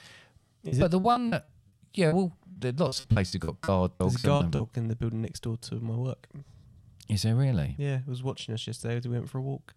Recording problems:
choppy; very; from 0.5 to 4.5 s; 20% of the speech affected

